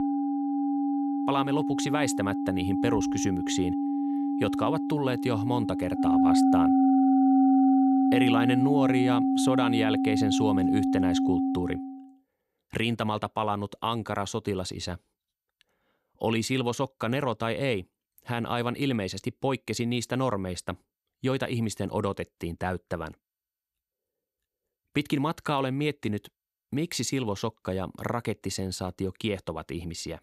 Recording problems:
background music; very loud; until 12 s; 5 dB above the speech

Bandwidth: 13.5 kHz